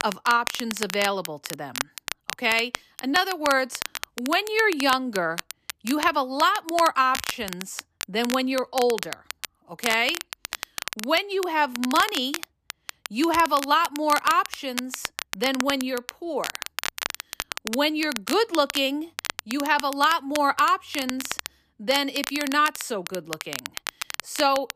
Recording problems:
crackle, like an old record; loud; 9 dB below the speech

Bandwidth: 14.5 kHz